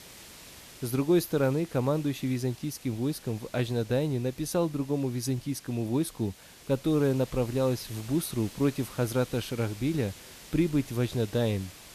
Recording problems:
hiss; noticeable; throughout; 20 dB below the speech

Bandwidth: 14.5 kHz